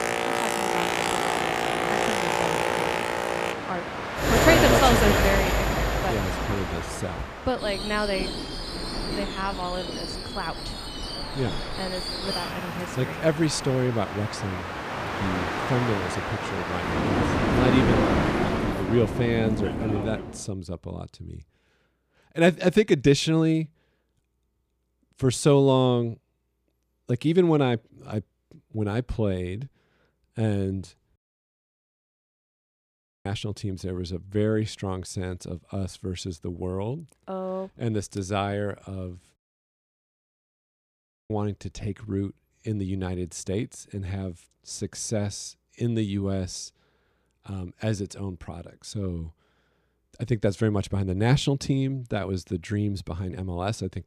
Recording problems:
train or aircraft noise; very loud; until 20 s; 1 dB above the speech
audio cutting out; at 31 s for 2 s and at 39 s for 2 s

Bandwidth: 15 kHz